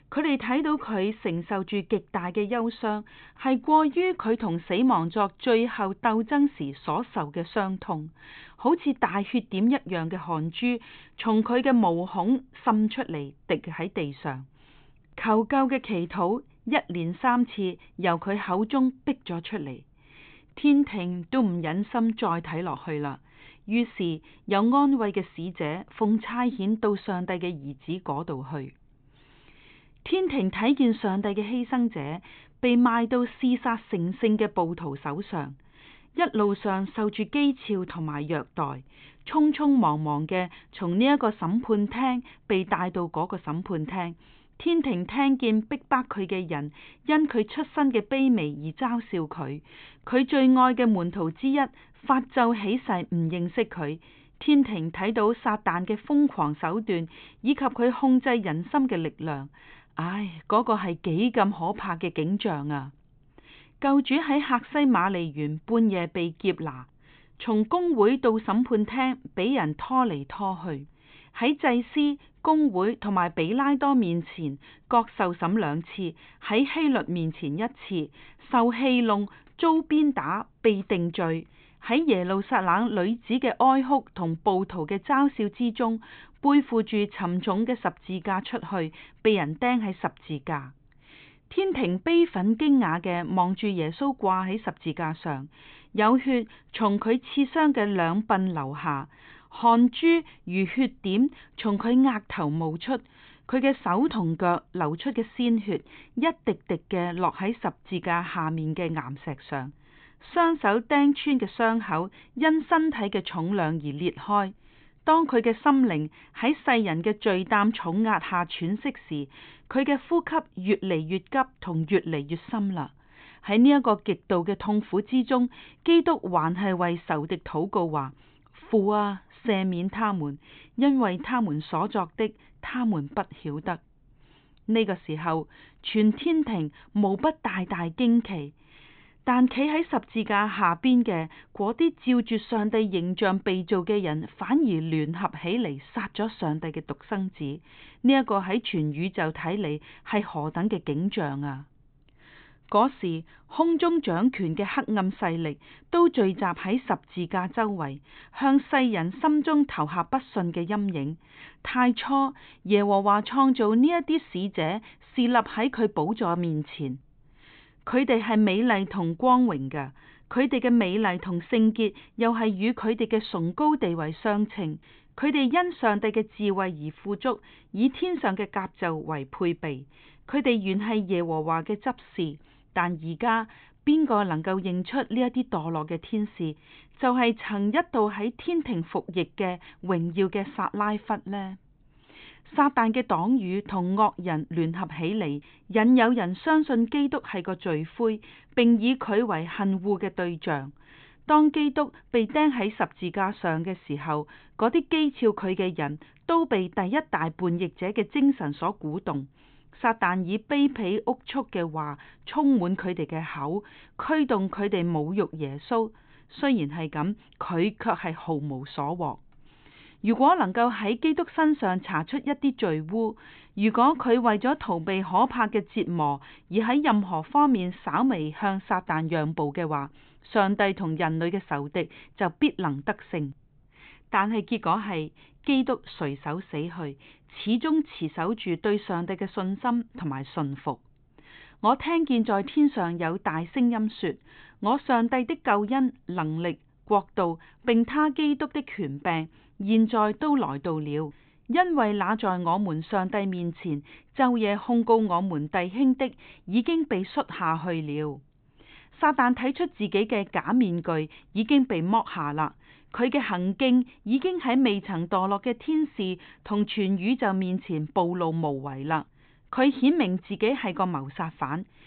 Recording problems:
high frequencies cut off; severe; nothing above 4 kHz

